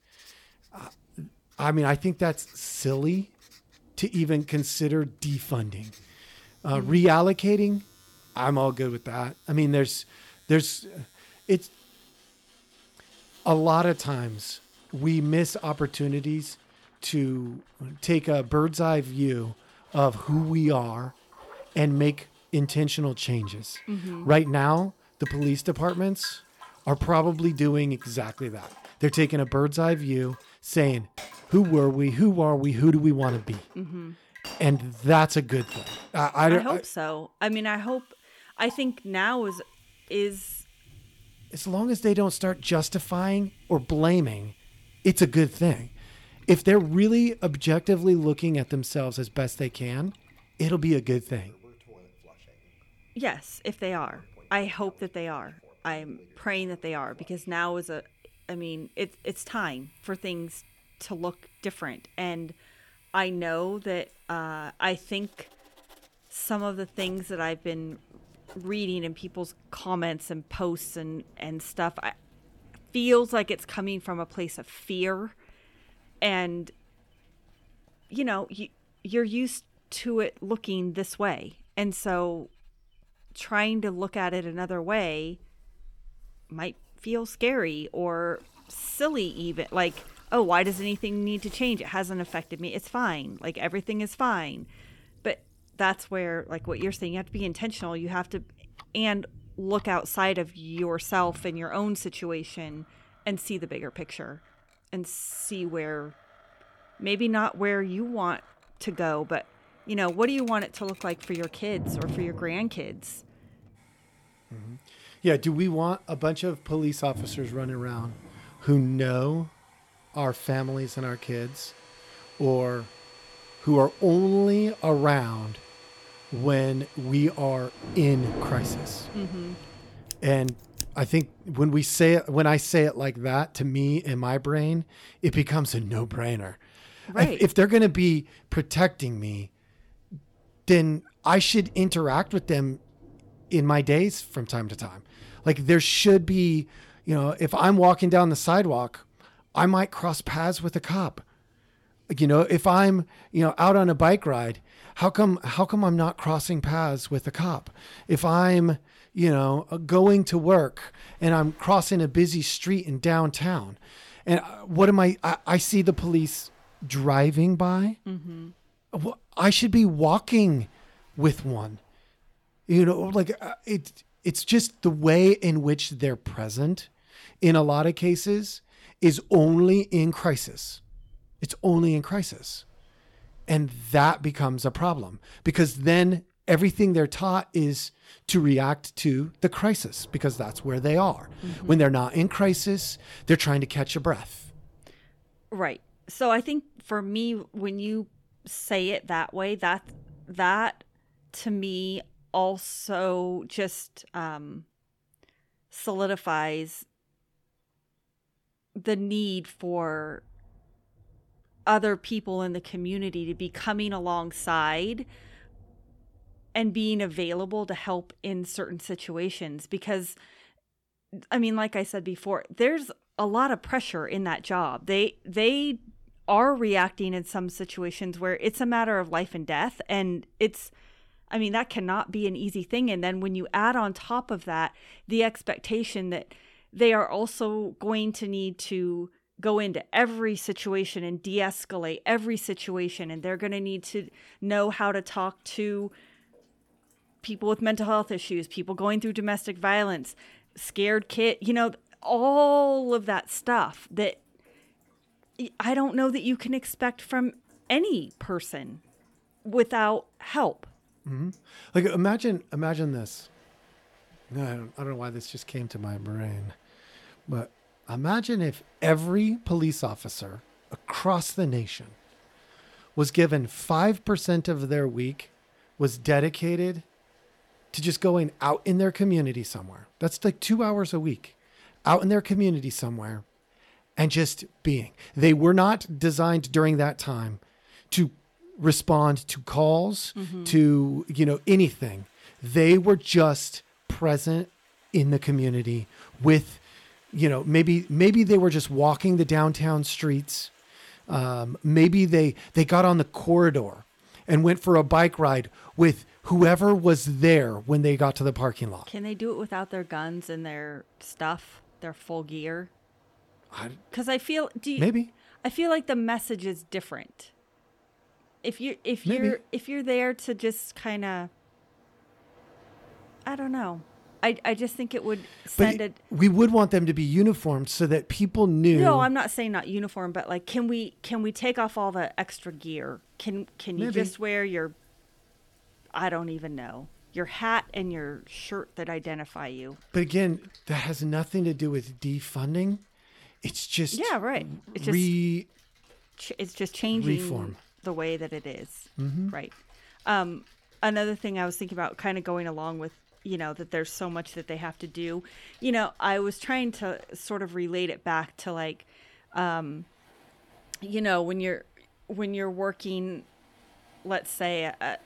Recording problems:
household noises; faint; until 2:11; 25 dB below the speech
rain or running water; faint; throughout; 25 dB below the speech

